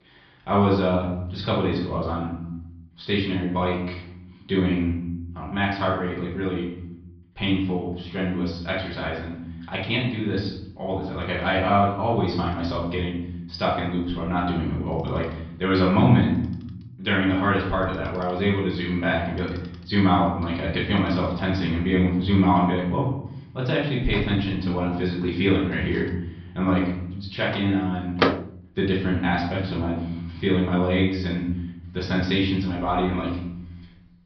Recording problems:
off-mic speech; far
room echo; noticeable; dies away in 0.8 s
high frequencies cut off; noticeable; nothing above 5.5 kHz
household noises; very faint; throughout; 7 dB below the speech

